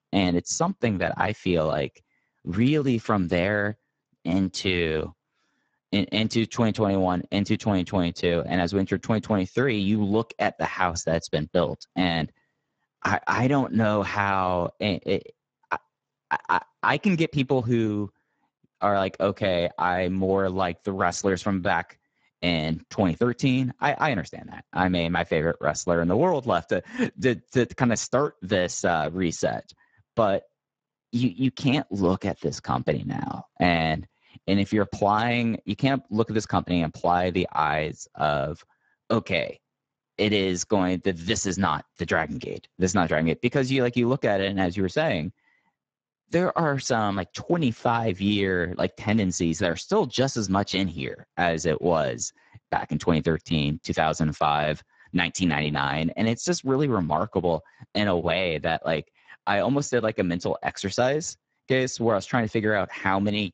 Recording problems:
garbled, watery; badly; nothing above 7.5 kHz

